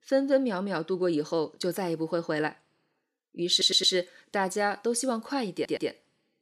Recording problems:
audio stuttering; at 3.5 s and at 5.5 s

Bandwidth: 15.5 kHz